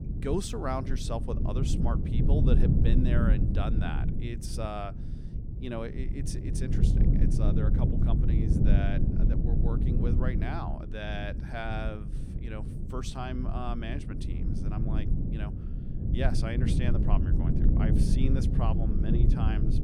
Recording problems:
low rumble; loud; throughout; 2 dB below the speech

